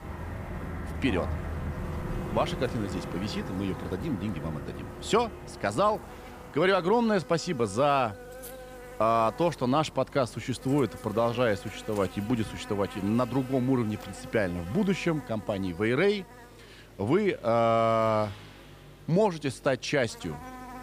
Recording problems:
electrical hum; noticeable; throughout; 50 Hz, 15 dB below the speech
traffic noise; noticeable; throughout; 10 dB below the speech

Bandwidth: 15 kHz